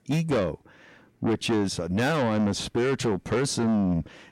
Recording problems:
distortion; heavy; 7 dB below the speech

